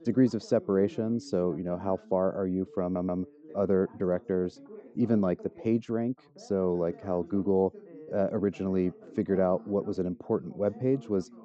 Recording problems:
high frequencies cut off; noticeable; nothing above 8 kHz
muffled; very slightly; fading above 1 kHz
background chatter; faint; throughout; 2 voices, 20 dB below the speech
audio stuttering; at 3 s

